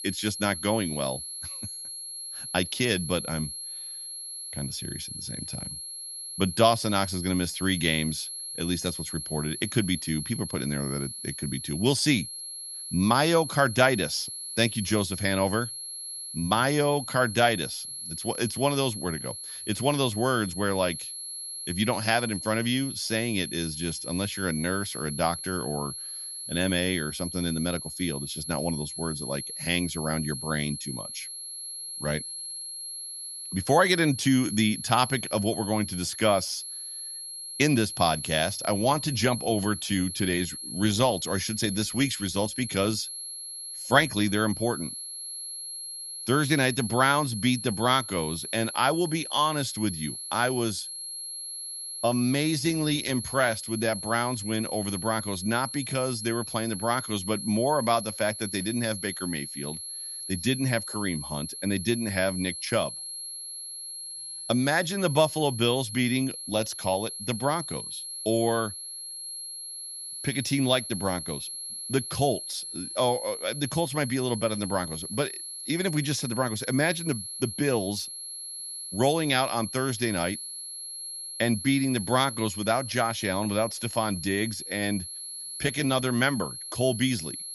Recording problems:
high-pitched whine; loud; throughout; 11 kHz, 7 dB below the speech

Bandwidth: 14.5 kHz